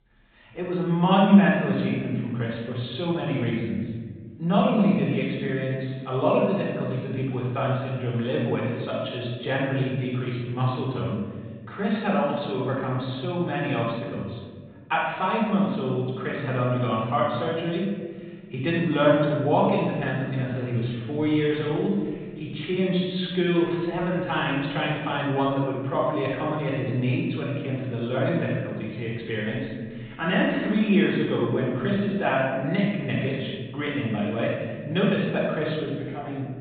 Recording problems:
room echo; strong; dies away in 1.6 s
off-mic speech; far
high frequencies cut off; severe; nothing above 4 kHz

